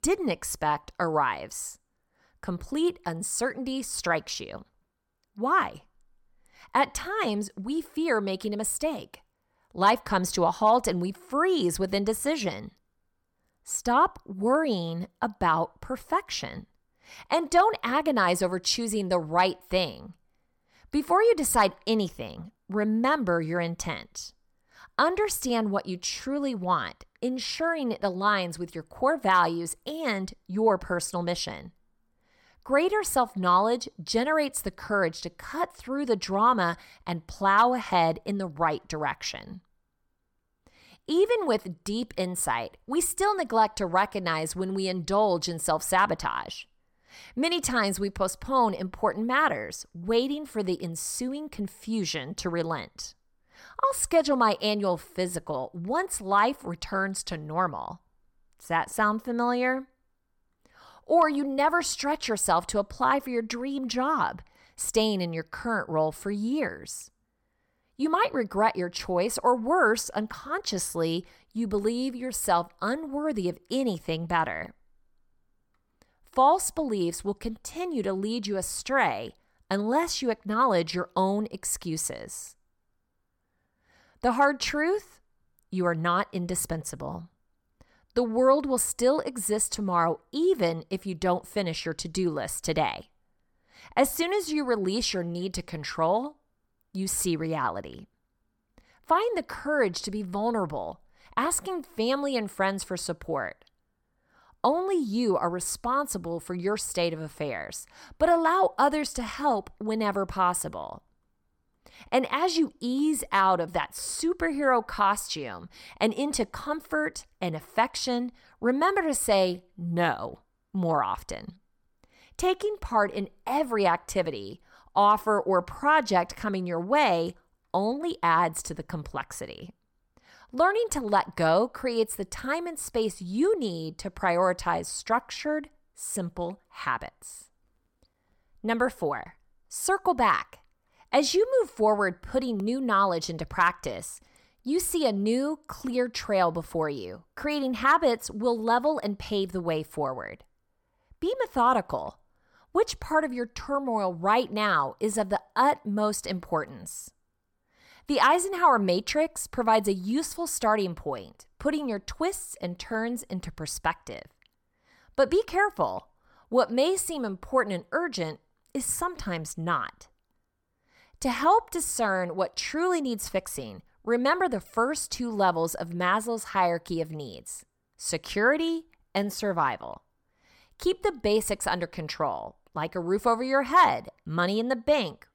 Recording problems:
none

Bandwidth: 17.5 kHz